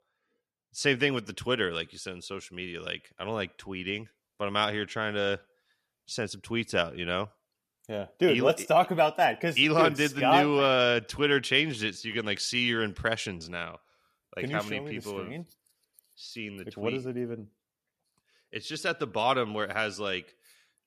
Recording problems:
none

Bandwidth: 14.5 kHz